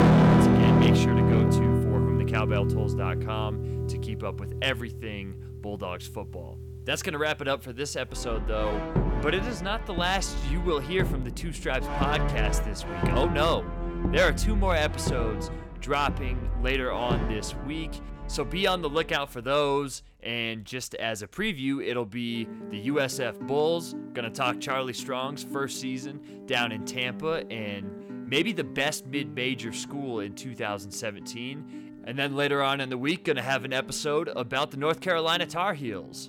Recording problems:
distortion; heavy; 1.6% of the sound clipped
background music; very loud; throughout; 1 dB above the speech

